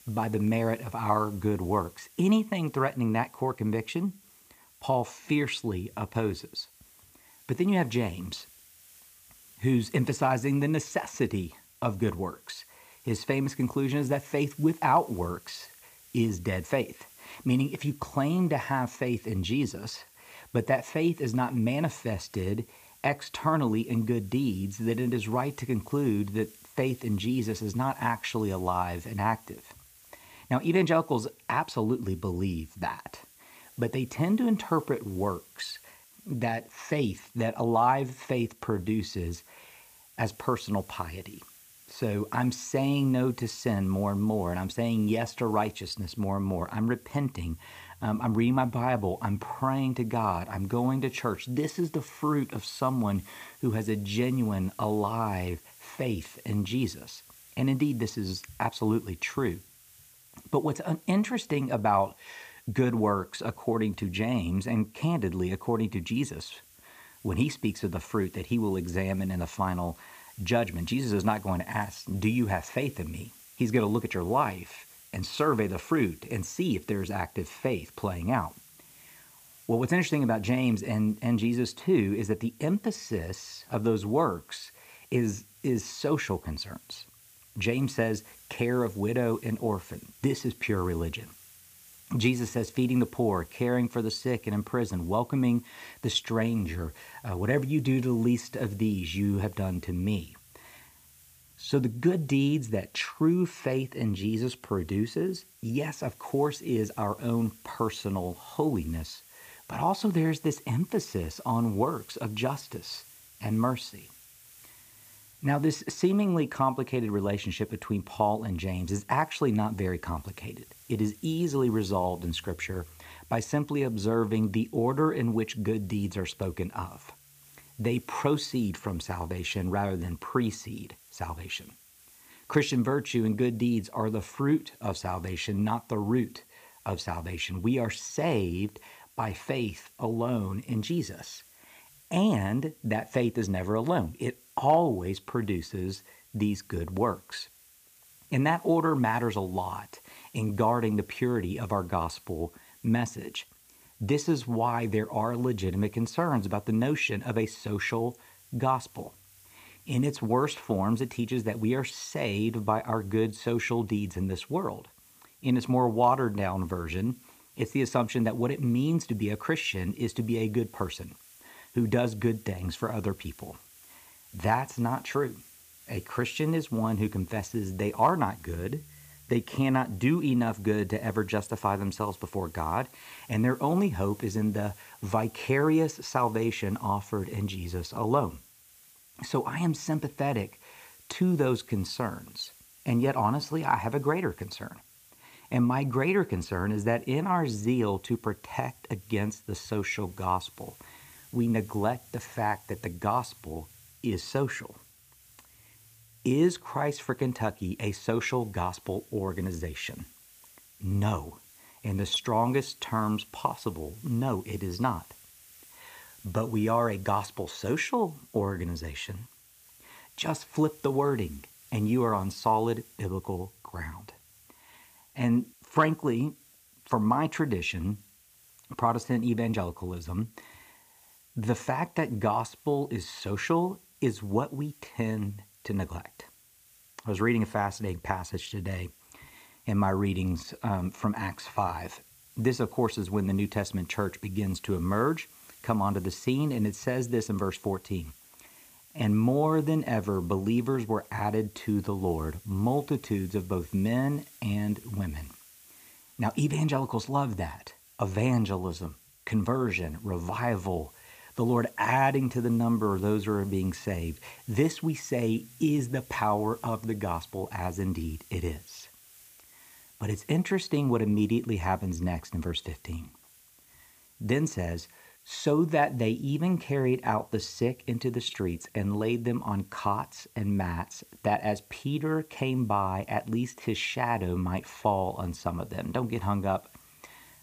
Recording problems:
hiss; faint; throughout; 25 dB below the speech

